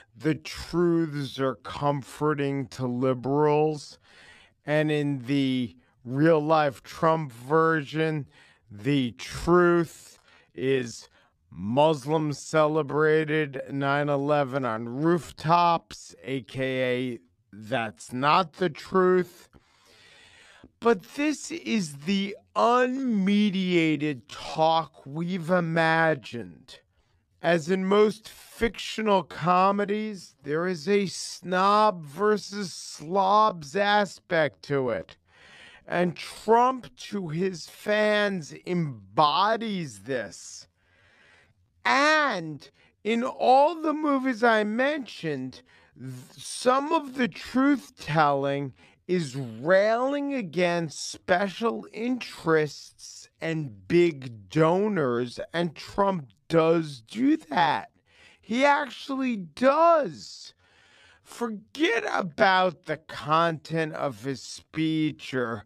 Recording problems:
wrong speed, natural pitch; too slow; 0.5 times normal speed

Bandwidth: 14.5 kHz